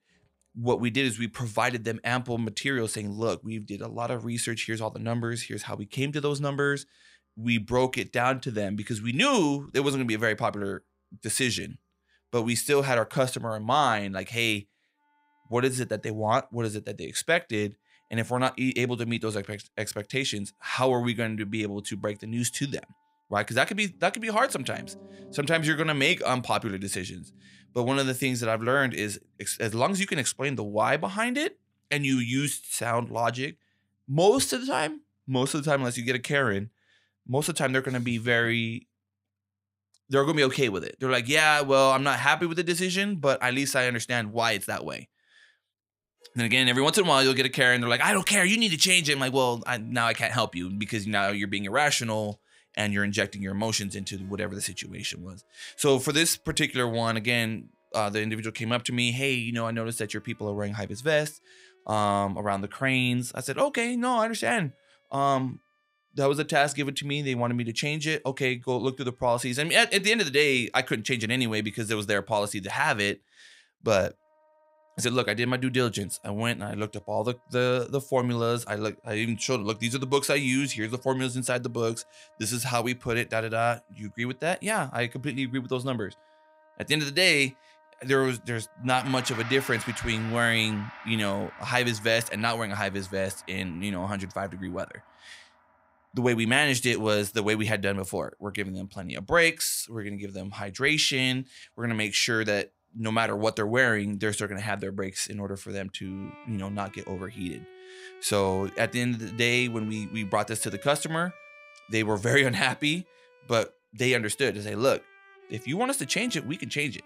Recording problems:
background music; faint; throughout; 25 dB below the speech

